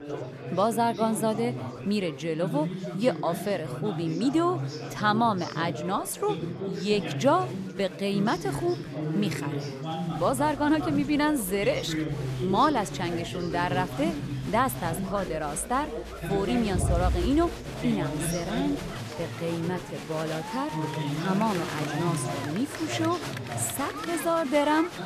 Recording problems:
chatter from many people; loud; throughout; 5 dB below the speech

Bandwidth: 14 kHz